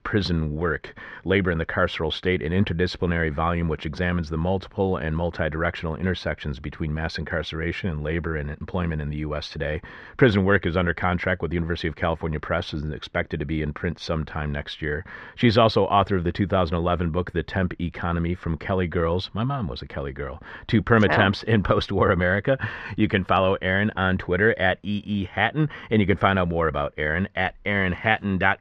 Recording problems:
muffled; slightly; fading above 2.5 kHz

